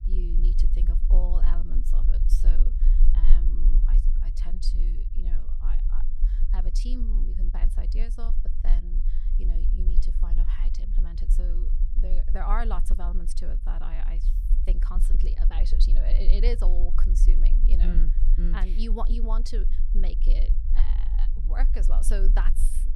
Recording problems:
low rumble; loud; throughout; 10 dB below the speech

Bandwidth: 15.5 kHz